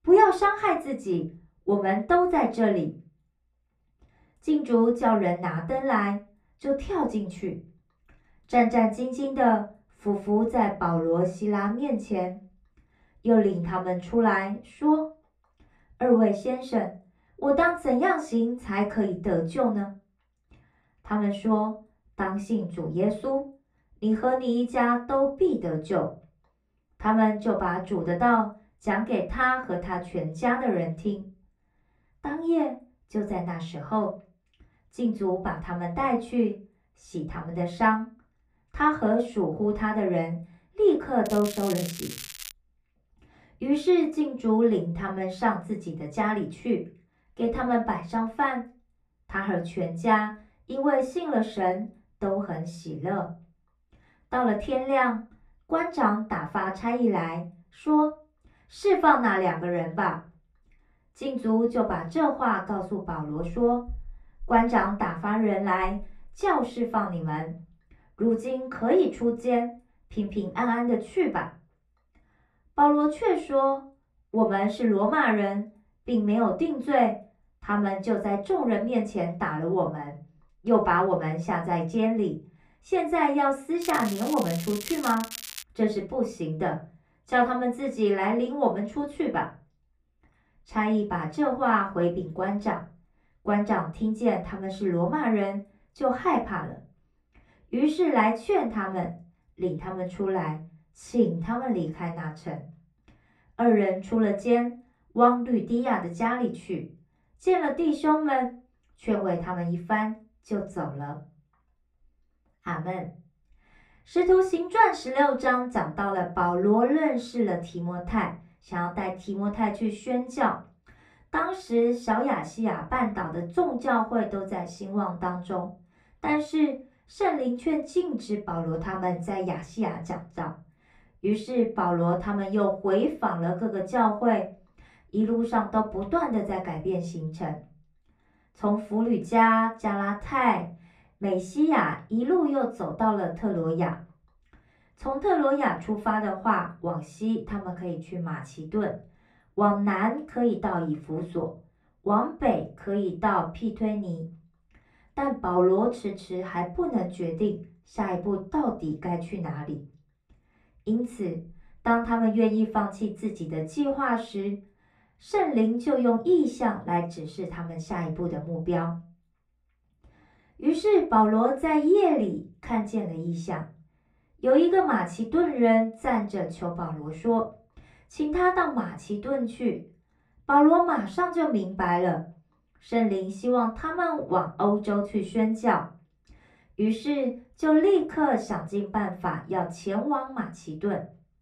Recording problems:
off-mic speech; far
muffled; slightly; fading above 3.5 kHz
room echo; very slight; dies away in 0.3 s
crackling; noticeable; from 41 to 43 s and from 1:24 to 1:26; 10 dB below the speech

